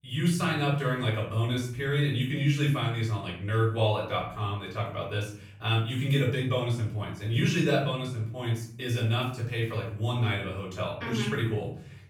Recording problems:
off-mic speech; far
room echo; noticeable; dies away in 0.6 s

